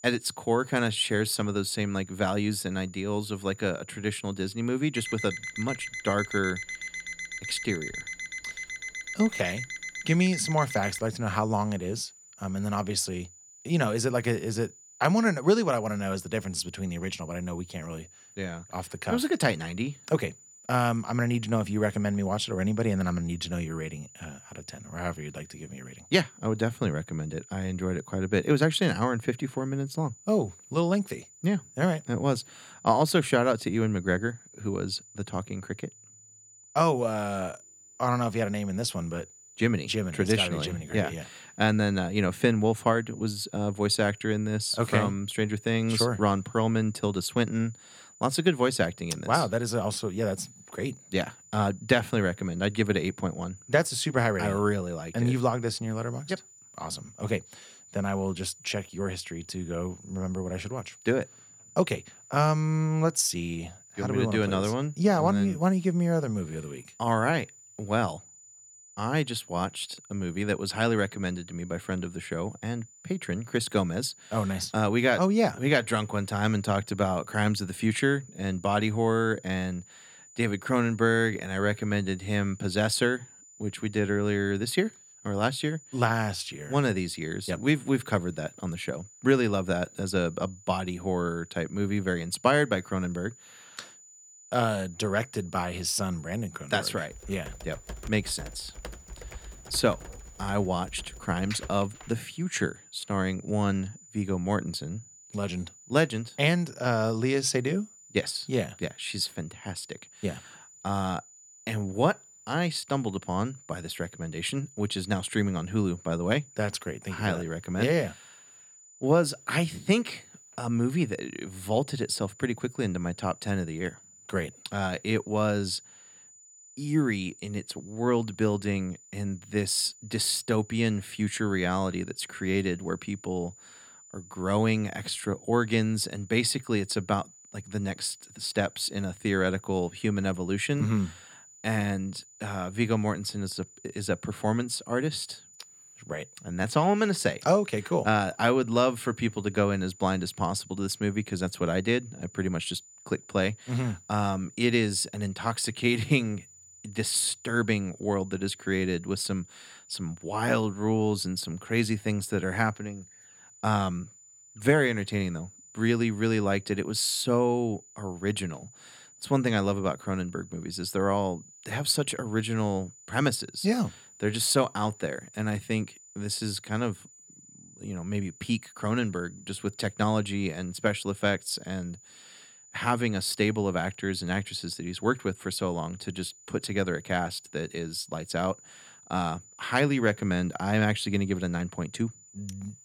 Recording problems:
high-pitched whine; faint; throughout; 7 kHz, 20 dB below the speech
alarm; noticeable; from 5 to 11 s; peak 6 dB below the speech
keyboard typing; faint; from 1:37 to 1:42; peak 10 dB below the speech

